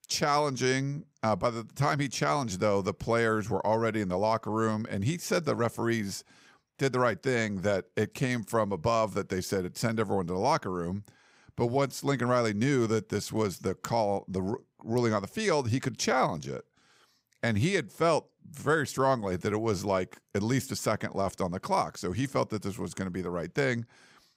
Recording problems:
none

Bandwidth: 15.5 kHz